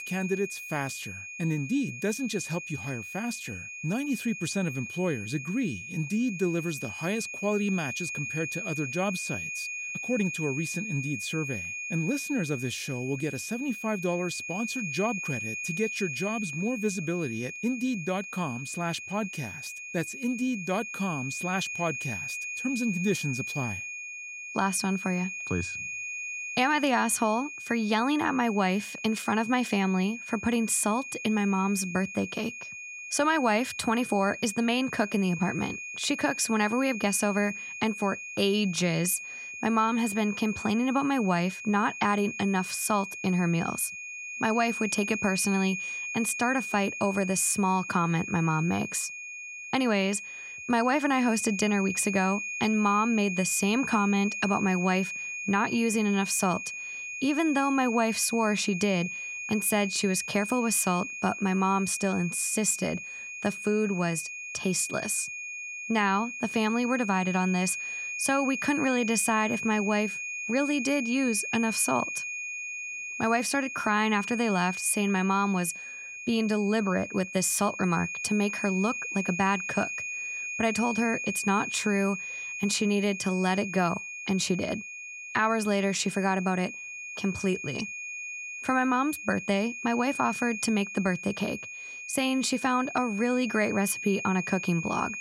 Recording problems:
high-pitched whine; loud; throughout; 2.5 kHz, 7 dB below the speech

